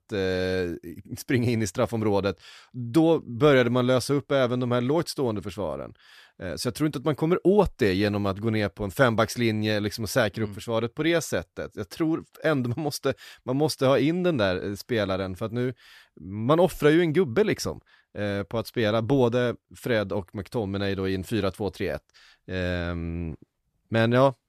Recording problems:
none

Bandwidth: 14.5 kHz